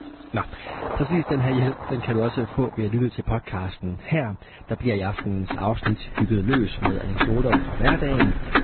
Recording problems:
garbled, watery; badly; nothing above 4 kHz
distortion; slight; 1.1% of the sound clipped
traffic noise; loud; throughout; 2 dB below the speech

